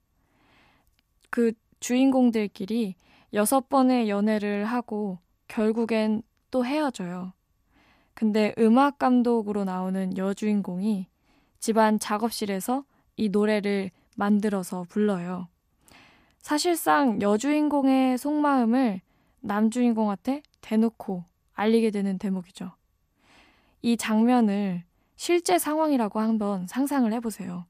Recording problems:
none

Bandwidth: 15 kHz